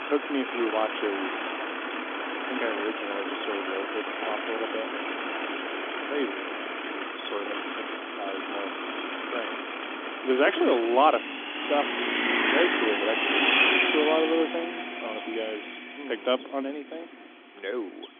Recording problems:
phone-call audio; nothing above 3.5 kHz
traffic noise; very loud; throughout; 1 dB above the speech

